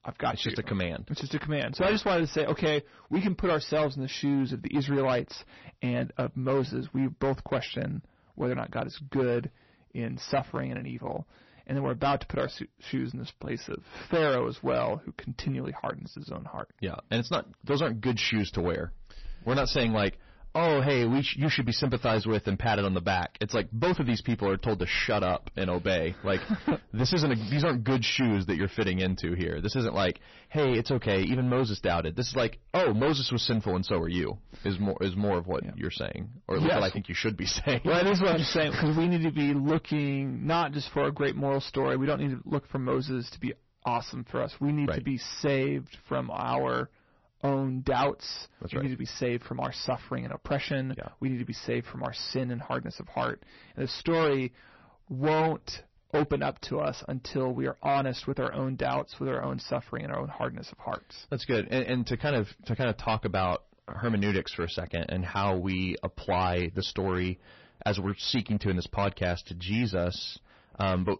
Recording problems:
distortion; heavy; 9% of the sound clipped
garbled, watery; slightly; nothing above 6 kHz

